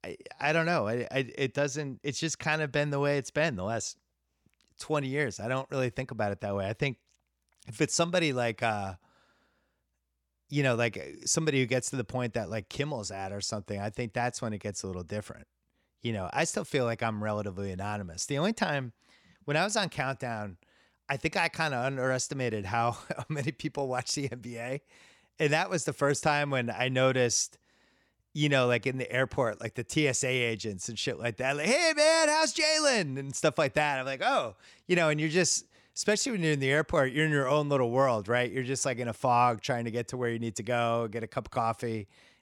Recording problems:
none

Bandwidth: 17.5 kHz